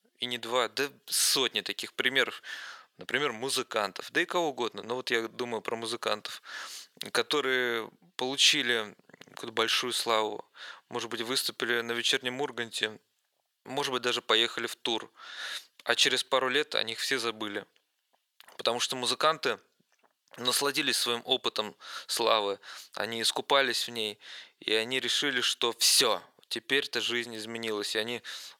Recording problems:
thin; very; fading below 650 Hz

